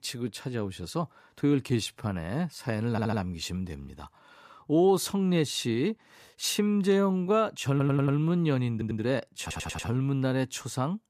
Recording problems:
uneven, jittery; strongly; from 1.5 to 10 s
audio stuttering; 4 times, first at 3 s

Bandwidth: 14.5 kHz